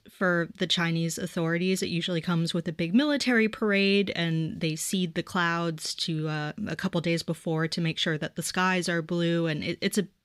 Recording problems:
none

